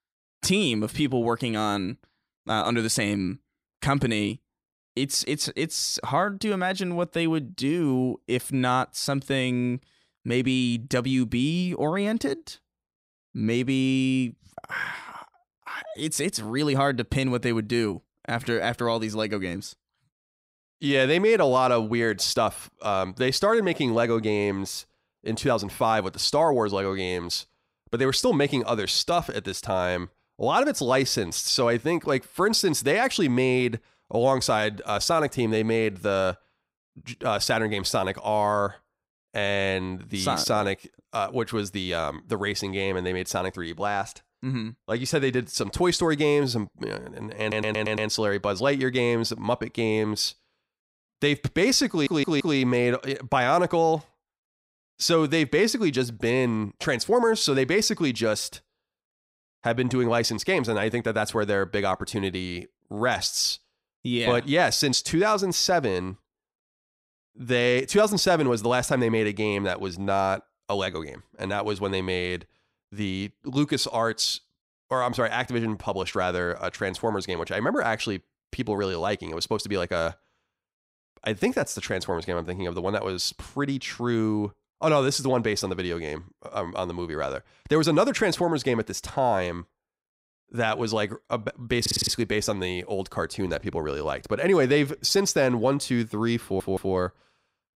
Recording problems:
audio stuttering; 4 times, first at 47 s

